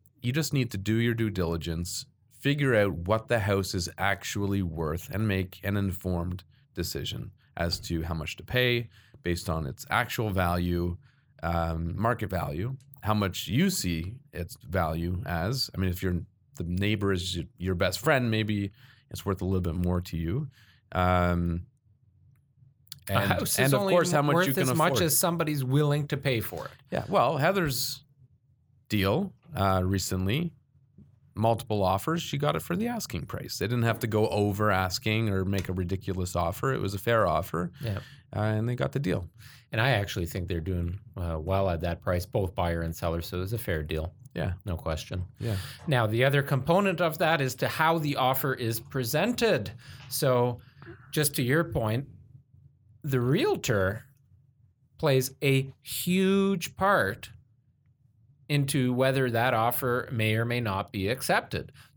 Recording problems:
none

